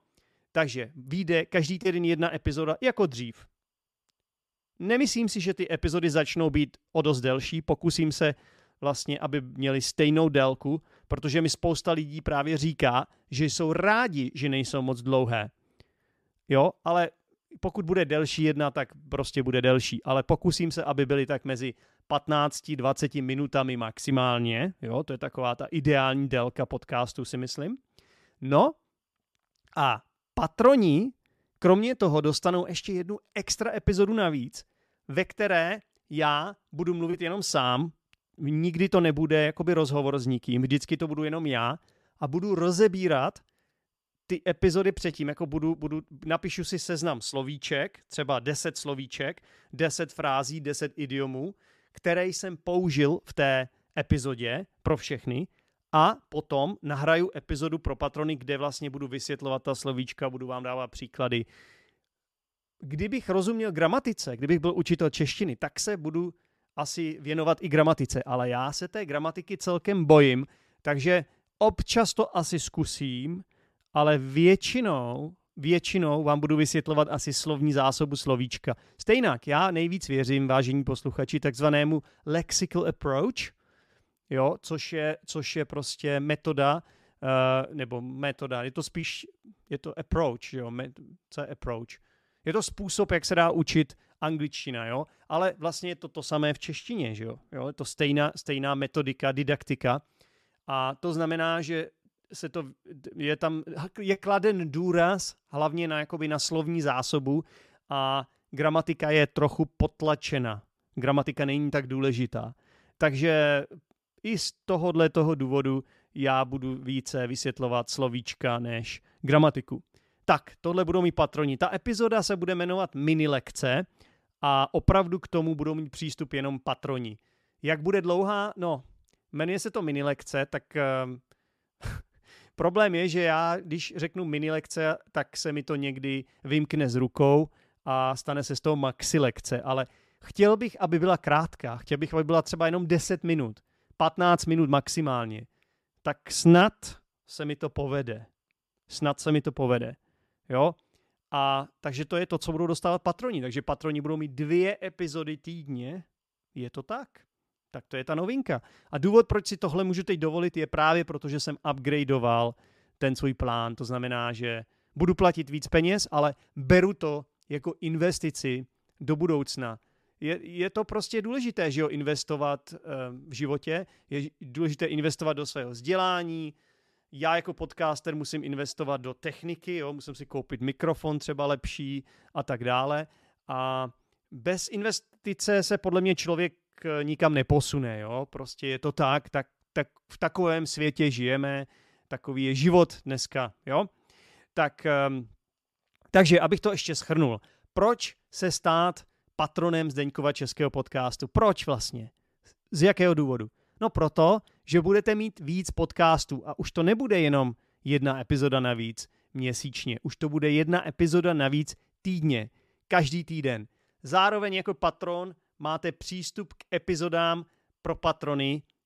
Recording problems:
none

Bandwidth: 14 kHz